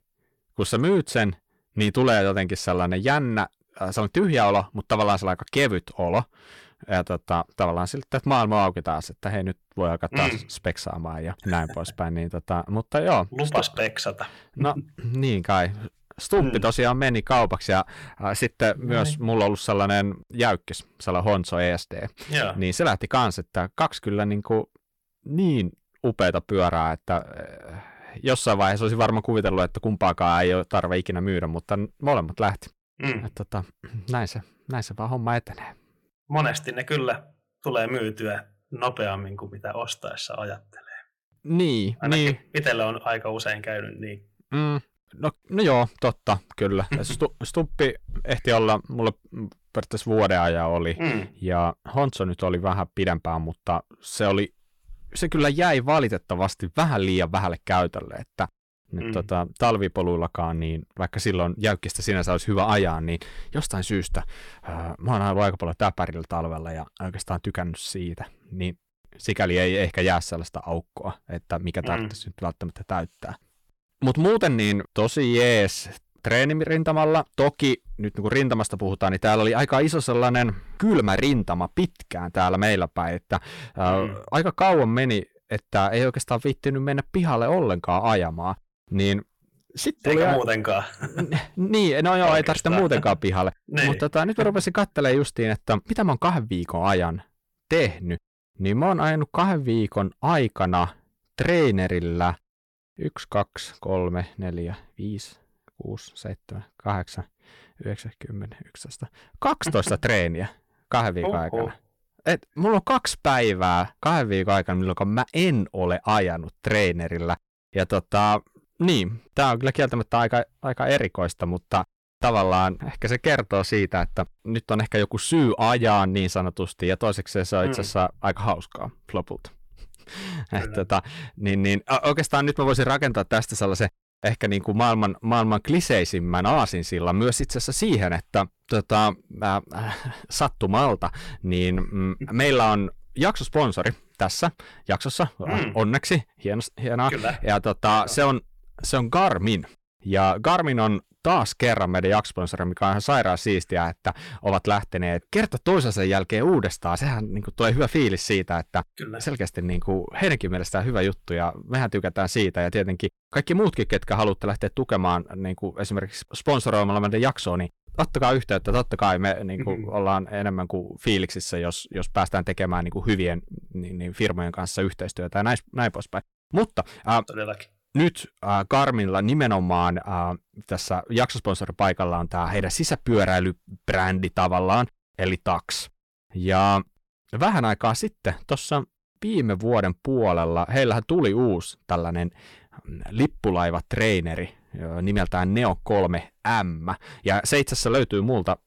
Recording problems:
distortion; slight; 10 dB below the speech

